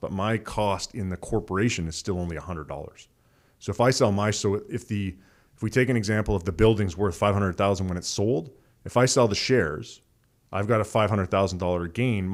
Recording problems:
abrupt cut into speech; at the end

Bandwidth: 15.5 kHz